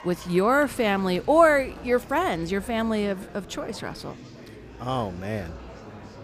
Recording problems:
murmuring crowd; noticeable; throughout; 20 dB below the speech

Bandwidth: 15 kHz